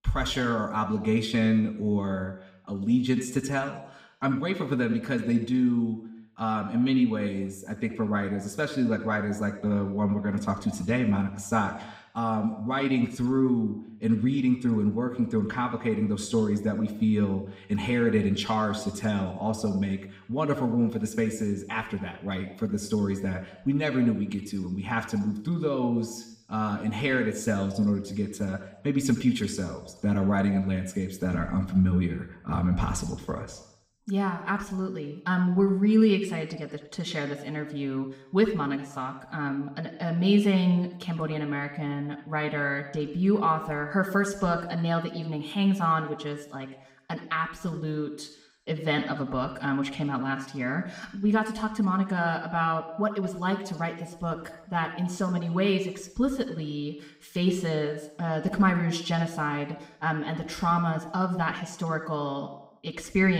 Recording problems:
room echo; slight; dies away in 0.8 s
off-mic speech; somewhat distant
abrupt cut into speech; at the end

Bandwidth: 15.5 kHz